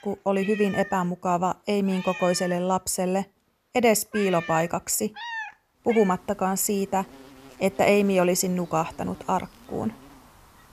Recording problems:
animal sounds; noticeable; throughout; 15 dB below the speech

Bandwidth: 14.5 kHz